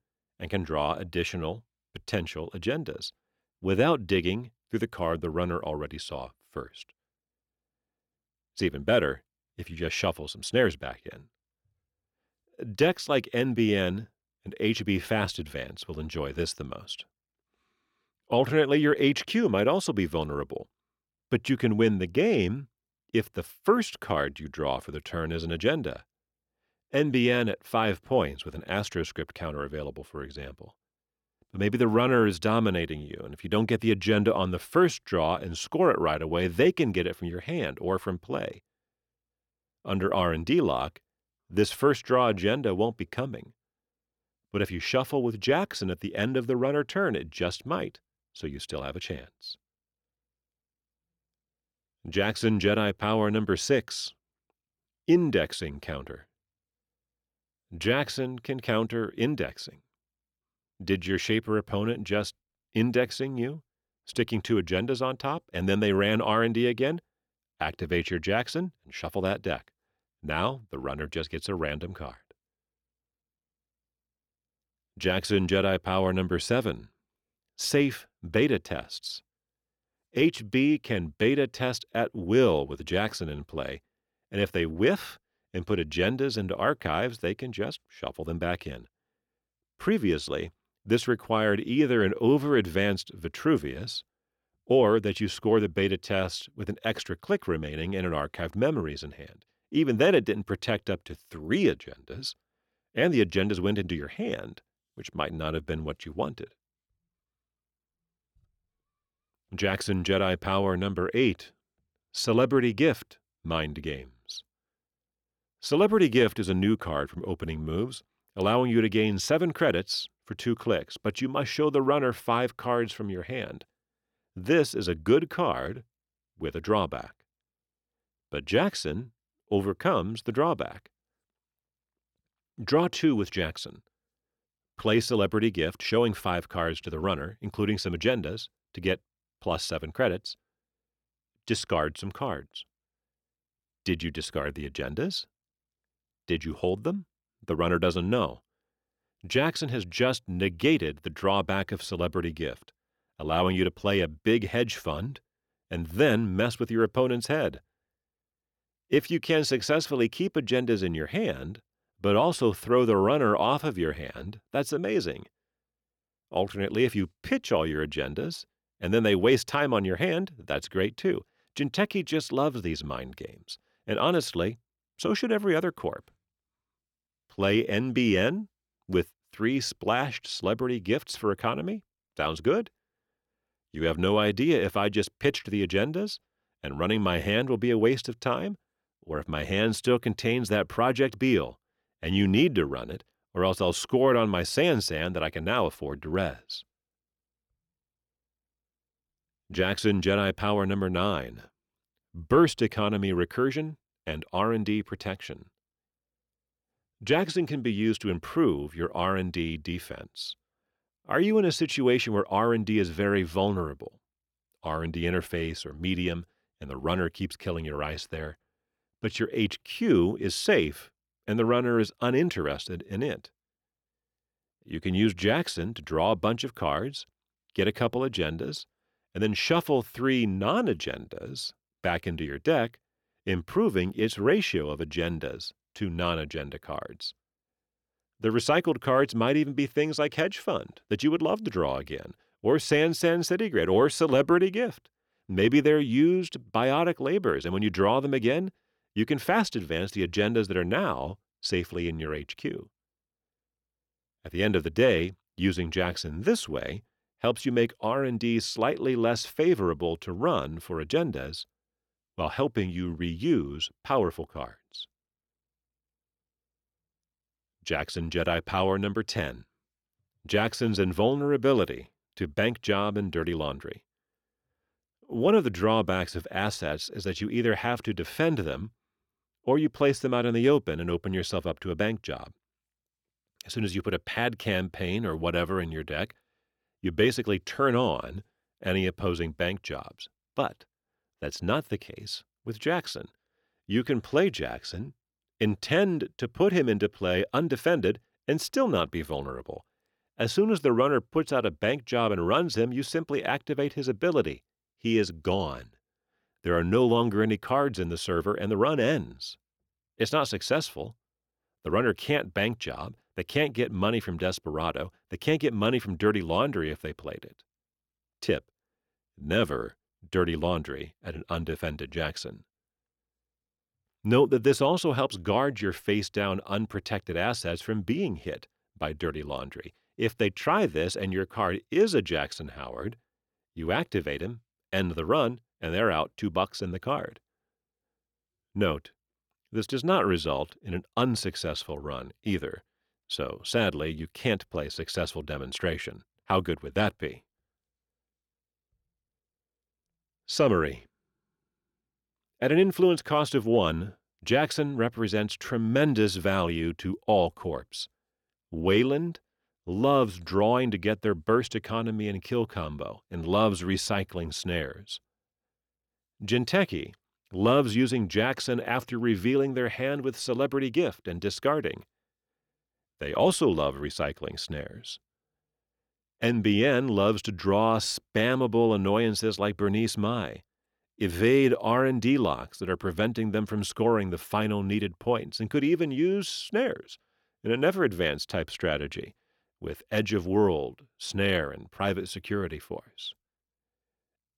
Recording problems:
none

